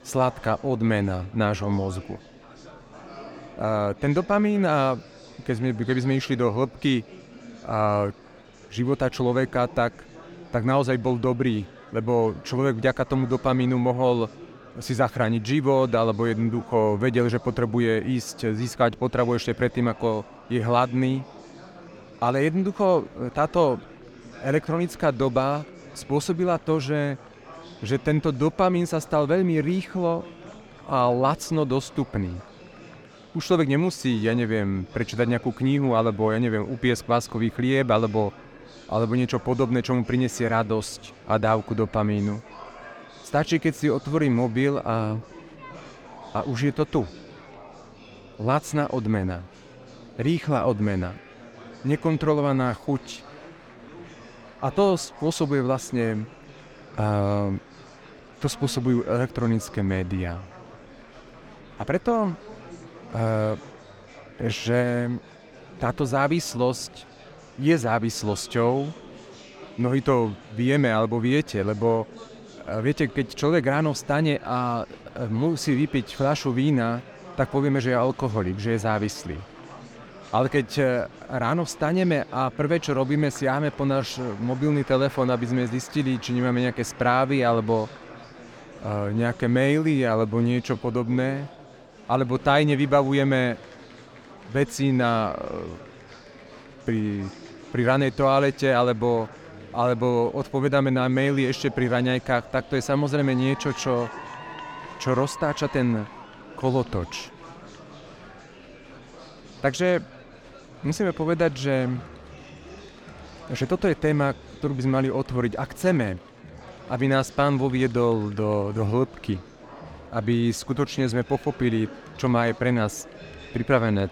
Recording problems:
murmuring crowd; noticeable; throughout; 20 dB below the speech

